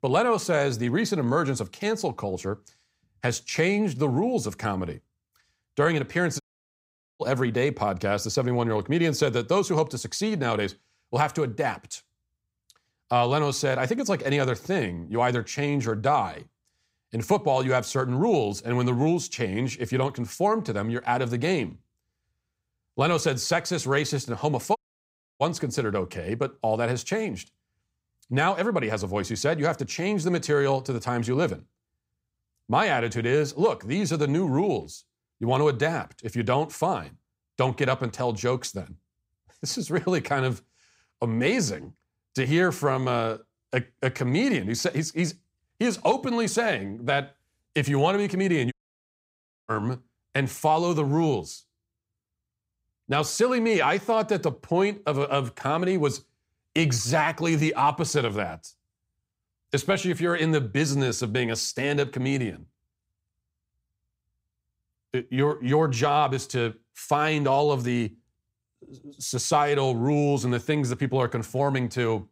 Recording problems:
audio cutting out; at 6.5 s for 1 s, at 25 s for 0.5 s and at 49 s for 1 s

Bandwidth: 15.5 kHz